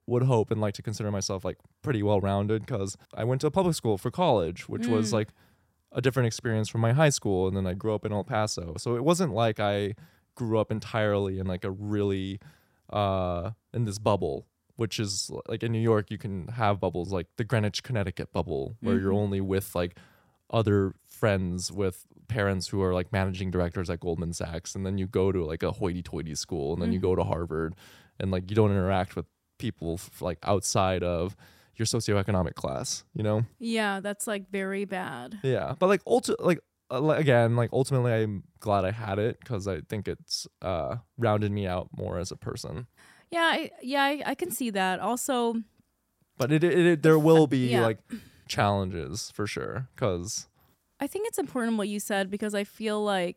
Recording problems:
none

